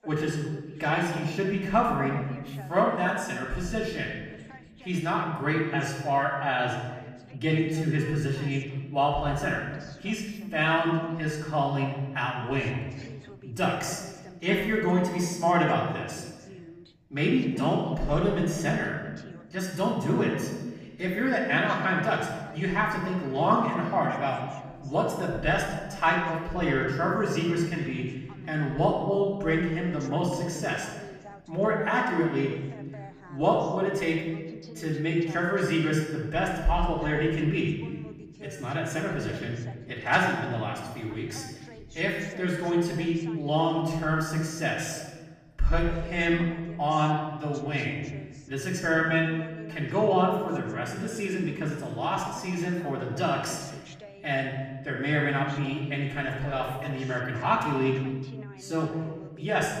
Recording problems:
off-mic speech; far
room echo; noticeable; dies away in 1.1 s
voice in the background; faint; throughout; 20 dB below the speech

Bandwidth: 14.5 kHz